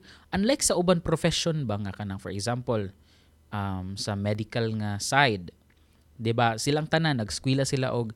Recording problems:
none

